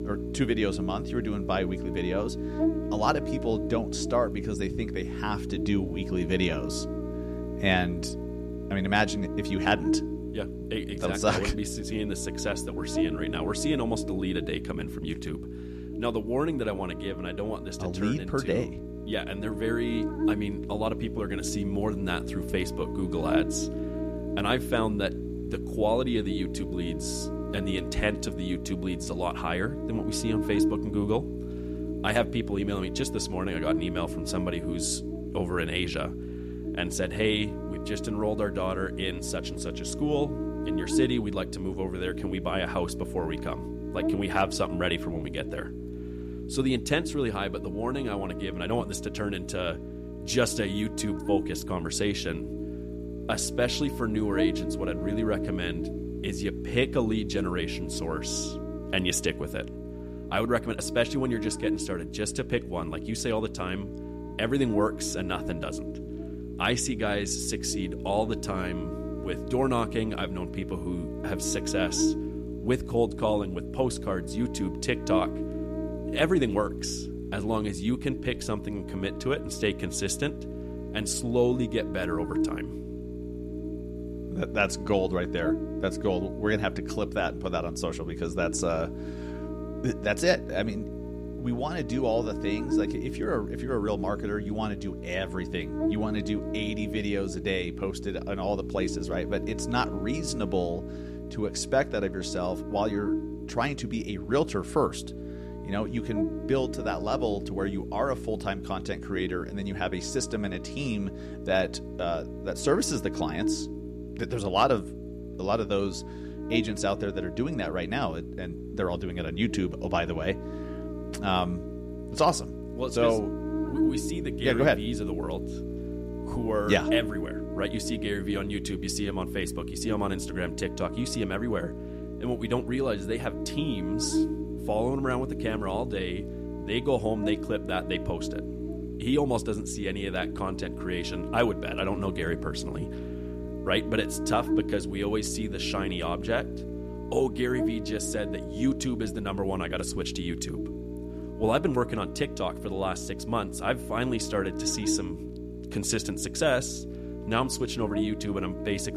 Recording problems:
electrical hum; loud; throughout; 60 Hz, 7 dB below the speech

